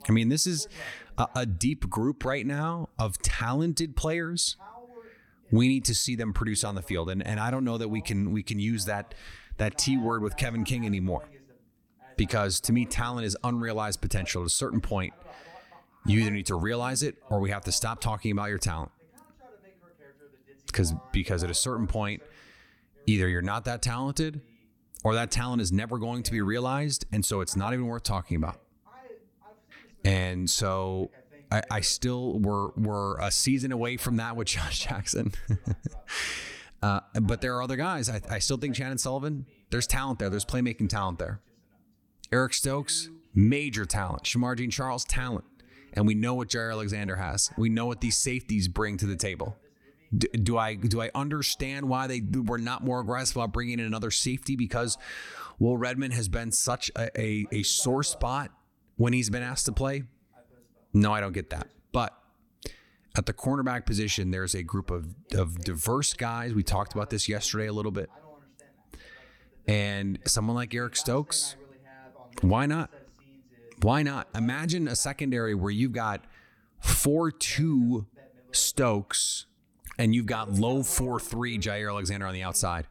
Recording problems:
voice in the background; faint; throughout; 25 dB below the speech

